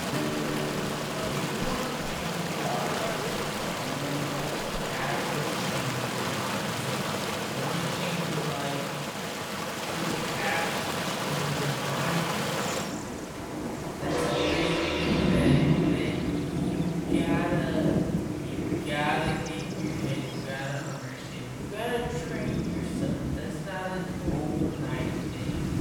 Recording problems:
off-mic speech; far
wrong speed, natural pitch; too slow; 0.6 times normal speed
room echo; noticeable; dies away in 1.2 s
background music; very loud; throughout; 1 dB above the speech
rain or running water; very loud; throughout; 5 dB above the speech
animal sounds; loud; throughout; 8 dB below the speech

